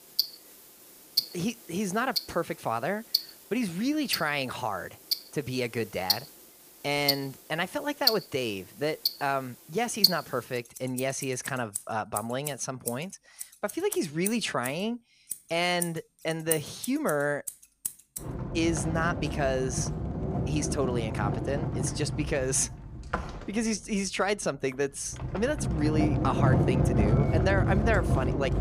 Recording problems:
household noises; very loud; throughout; as loud as the speech

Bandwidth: 15 kHz